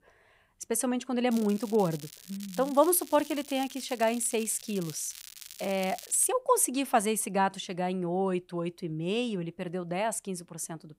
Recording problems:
crackling; noticeable; from 1.5 to 6.5 s; 15 dB below the speech

